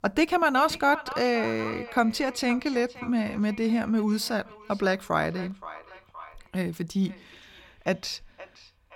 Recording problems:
echo of what is said; noticeable; throughout; 520 ms later, 15 dB below the speech

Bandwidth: 17 kHz